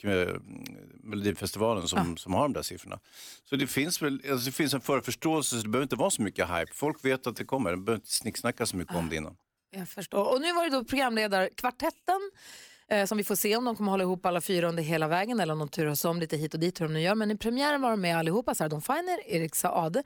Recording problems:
uneven, jittery; strongly; from 1 to 20 s

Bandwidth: 18 kHz